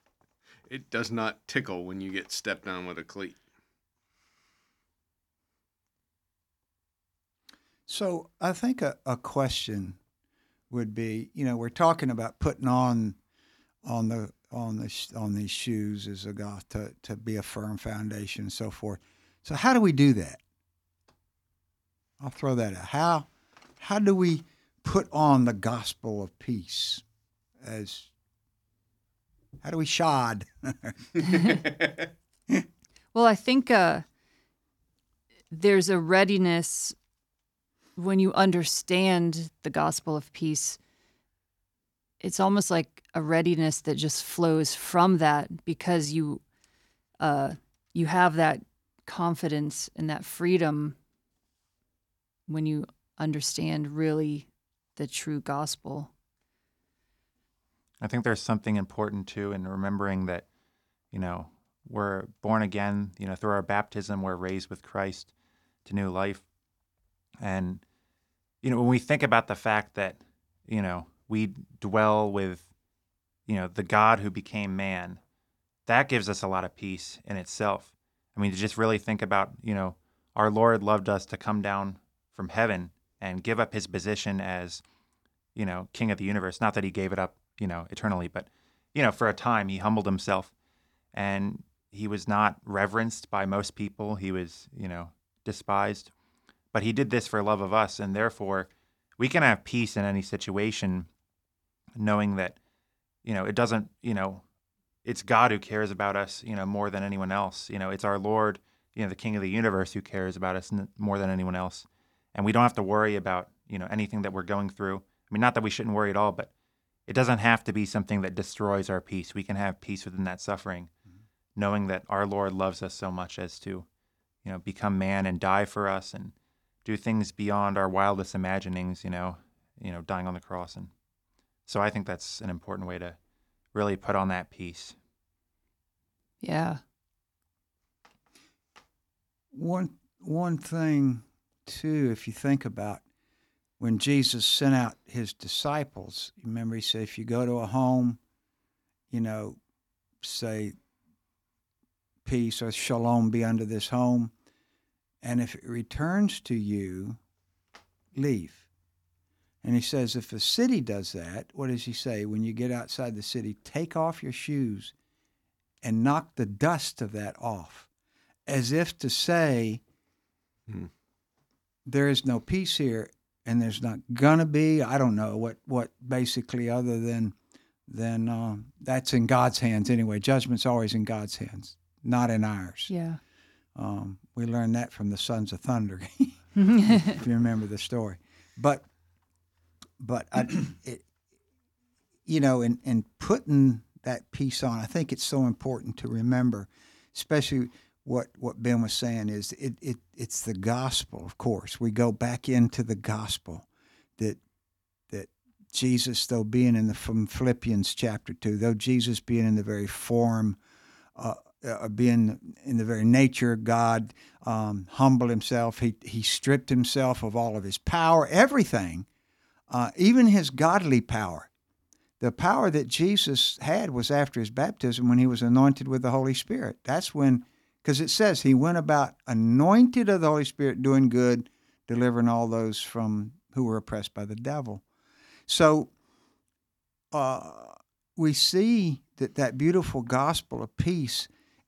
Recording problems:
none

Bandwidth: 18.5 kHz